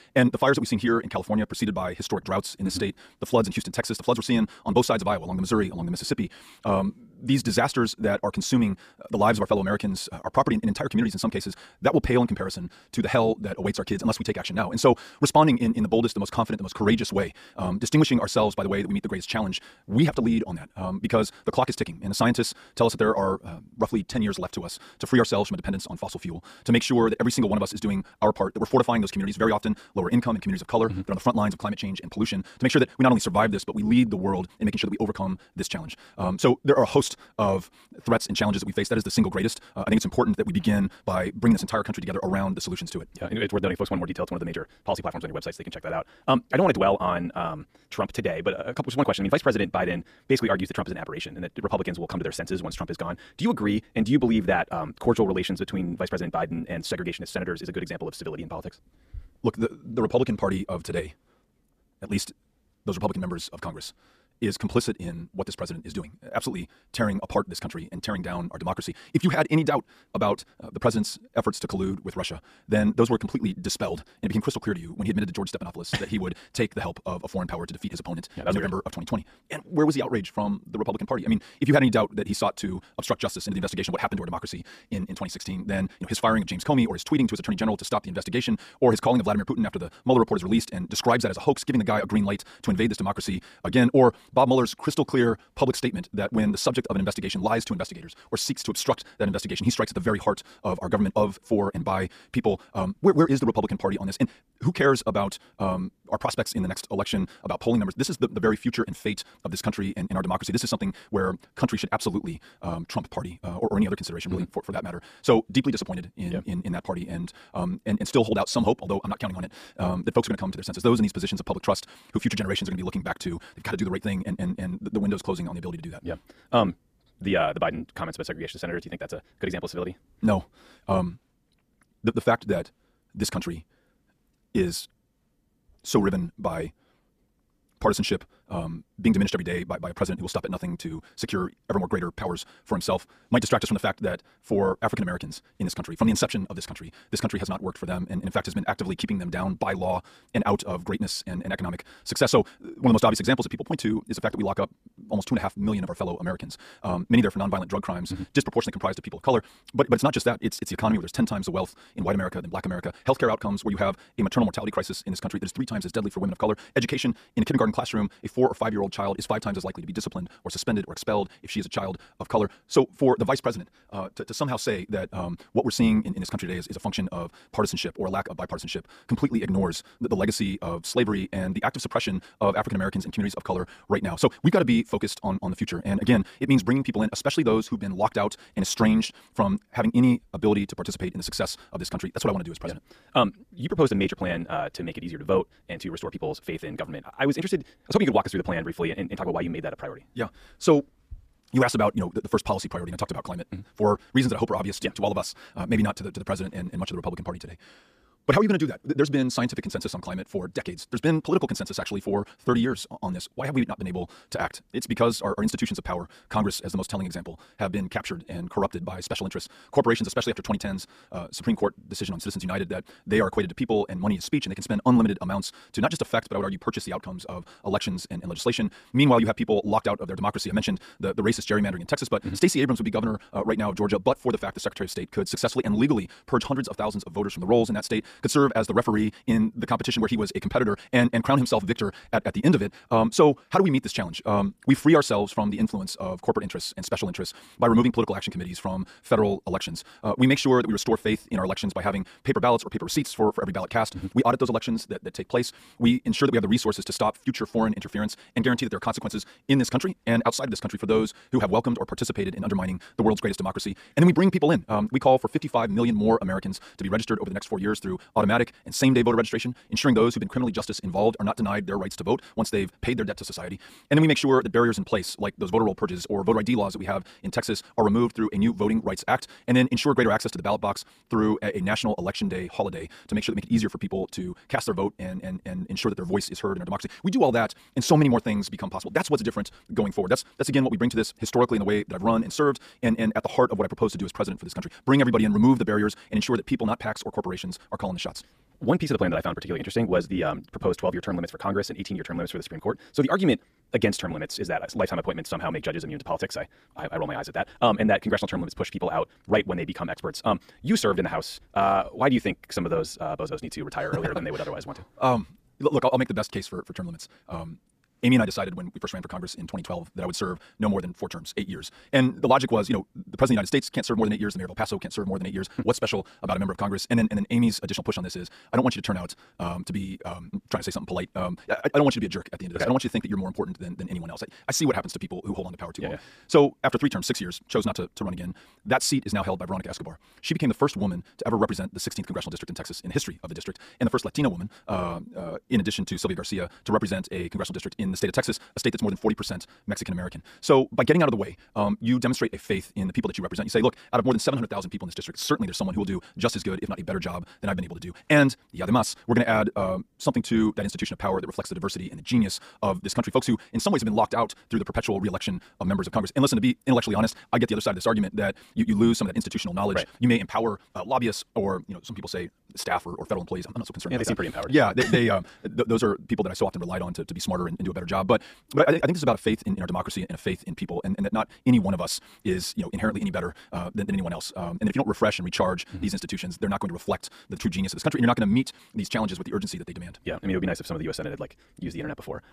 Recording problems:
wrong speed, natural pitch; too fast; 1.8 times normal speed

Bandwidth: 14.5 kHz